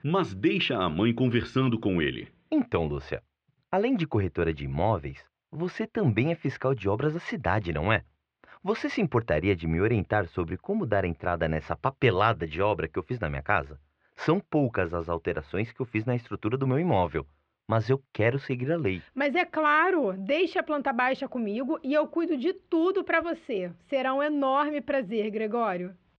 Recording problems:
muffled; very; fading above 3 kHz

